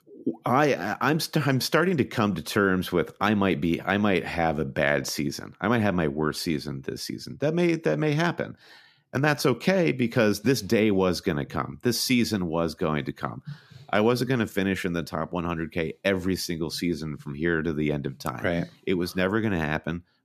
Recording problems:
none

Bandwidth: 14.5 kHz